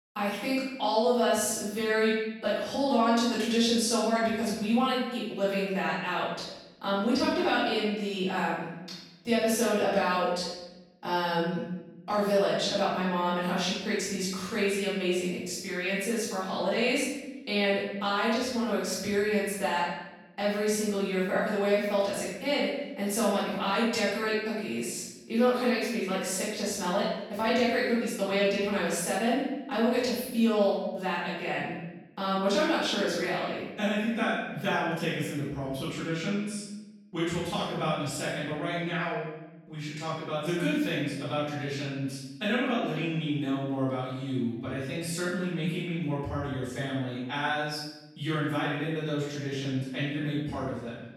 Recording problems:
room echo; strong; dies away in 1 s
off-mic speech; far

